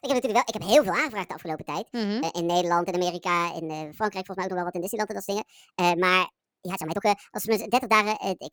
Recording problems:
wrong speed and pitch; too fast and too high; 1.5 times normal speed
uneven, jittery; strongly; from 0.5 to 7.5 s

